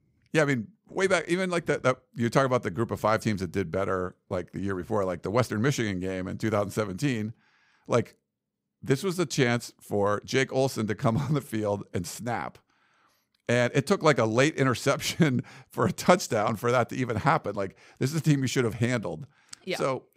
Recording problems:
none

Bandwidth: 15.5 kHz